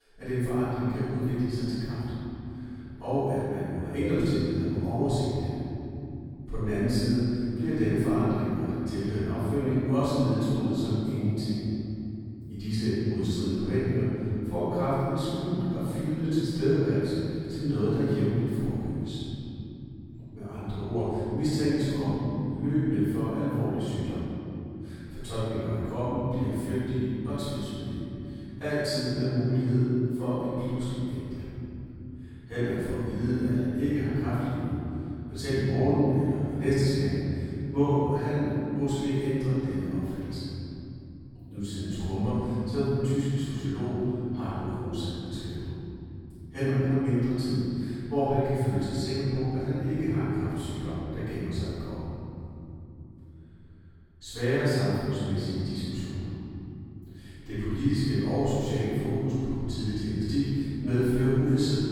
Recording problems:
room echo; strong; dies away in 3 s
off-mic speech; far

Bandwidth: 18 kHz